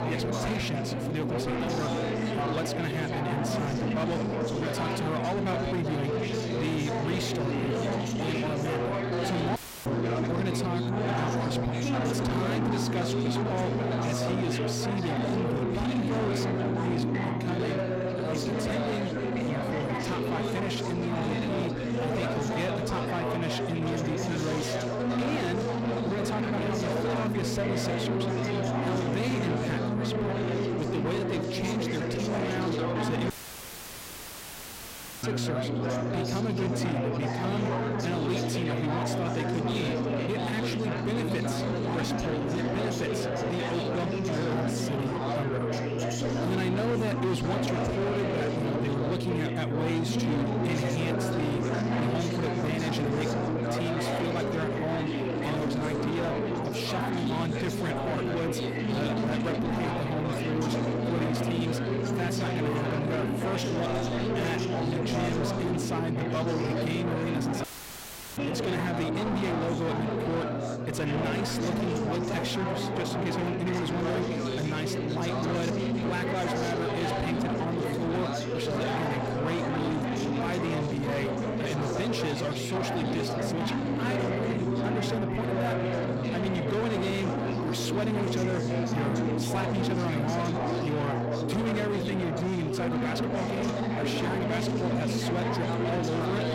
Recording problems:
distortion; heavy; 7 dB below the speech
chatter from many people; very loud; throughout; 1 dB above the speech
electrical hum; loud; throughout; 60 Hz, 9 dB below the speech
audio cutting out; filled with static; at 9.5 s, at 33 s for 2 s and at 1:08 for 0.5 s

